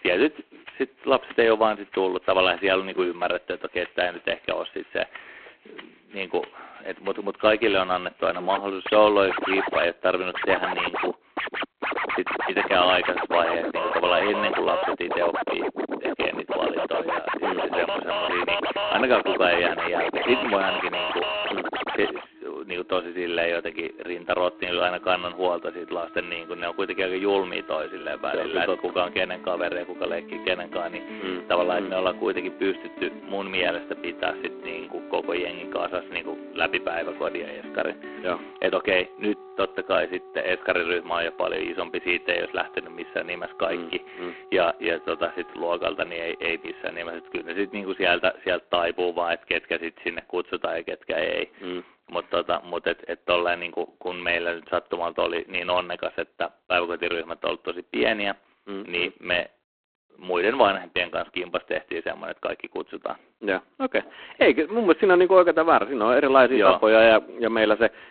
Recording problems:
phone-call audio; poor line
background music; loud; until 48 s; 5 dB below the speech

